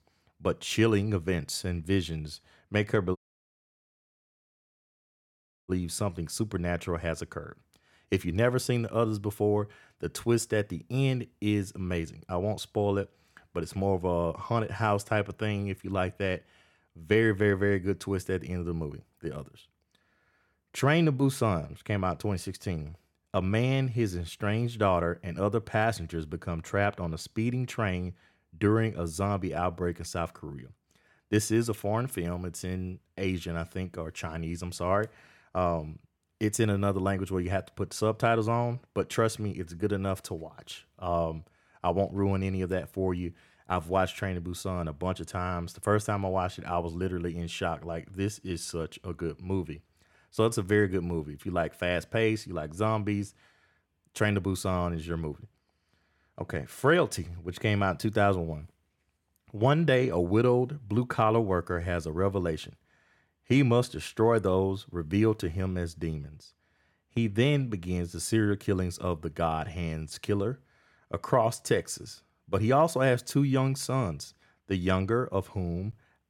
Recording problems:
audio cutting out; at 3 s for 2.5 s

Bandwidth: 17 kHz